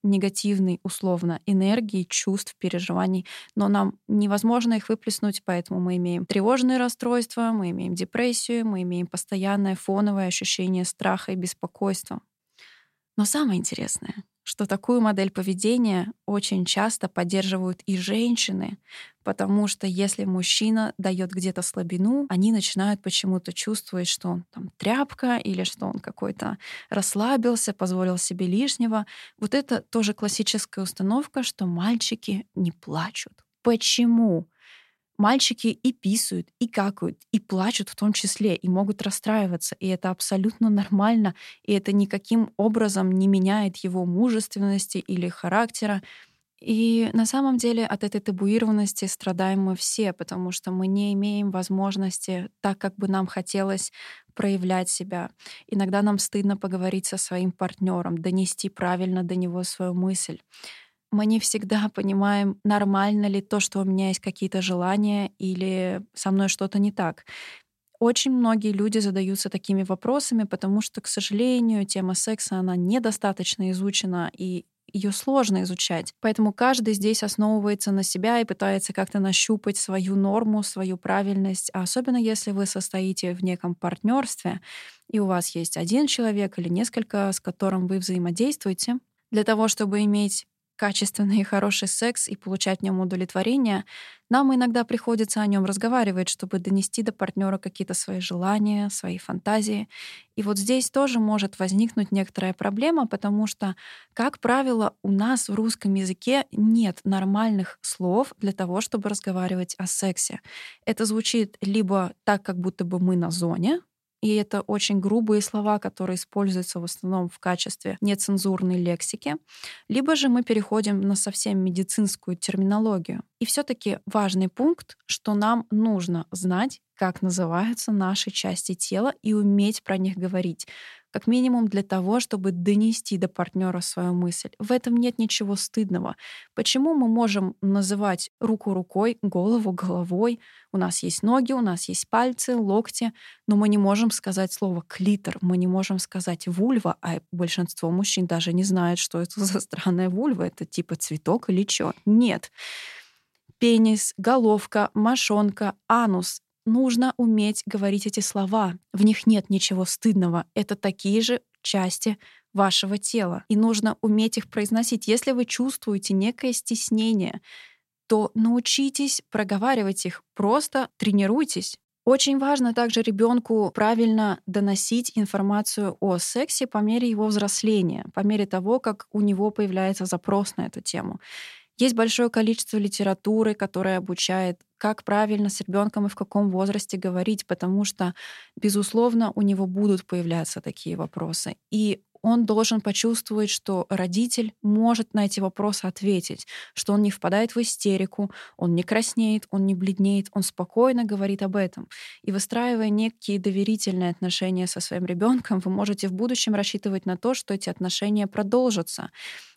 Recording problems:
none

